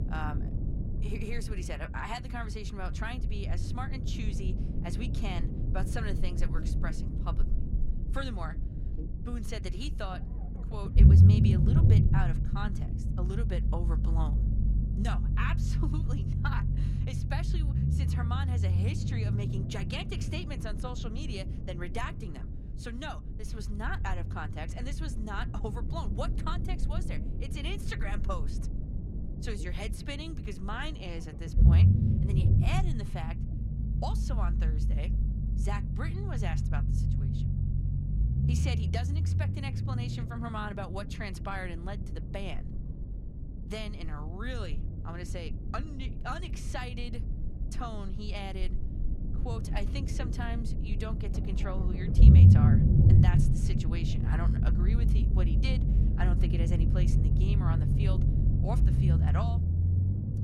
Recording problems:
low rumble; loud; throughout; 2 dB below the speech

